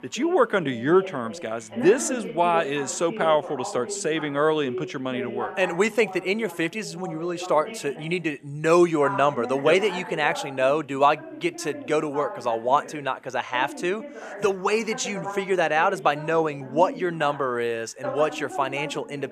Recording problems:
voice in the background; noticeable; throughout; 10 dB below the speech

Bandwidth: 14.5 kHz